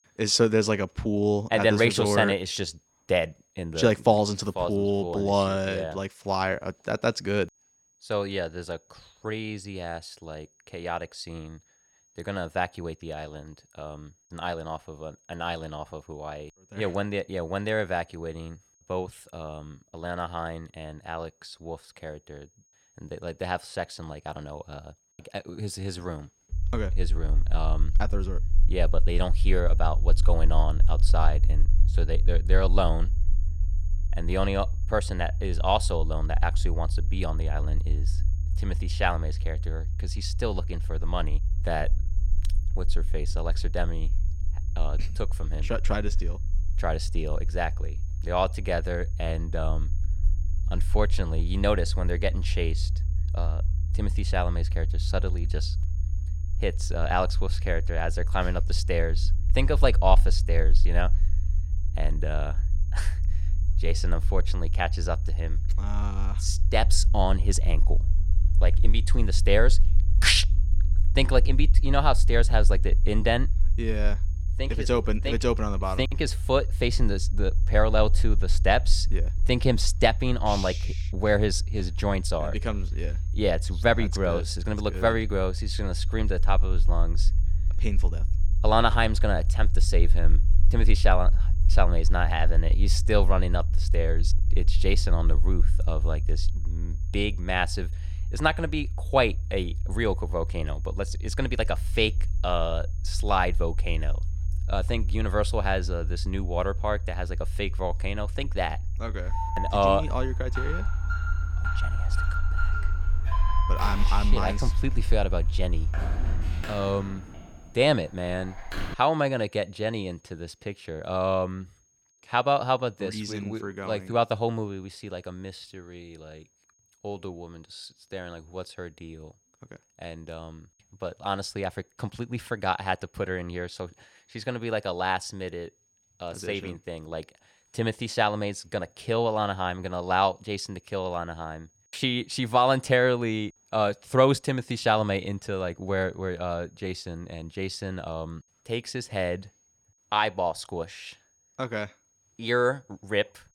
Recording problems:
high-pitched whine; faint; throughout; 6.5 kHz, 35 dB below the speech
low rumble; faint; from 27 s to 1:57; 20 dB below the speech
alarm; noticeable; from 1:49 to 1:59; peak 4 dB below the speech

